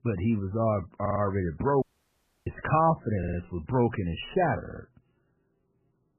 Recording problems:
garbled, watery; badly; nothing above 3 kHz
audio stuttering; at 1 s, at 3 s and at 4.5 s
audio cutting out; at 2 s for 0.5 s

